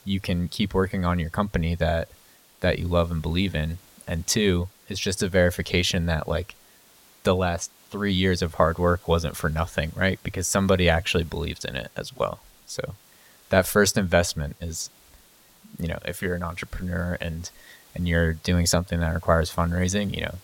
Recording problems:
hiss; faint; throughout; 25 dB below the speech

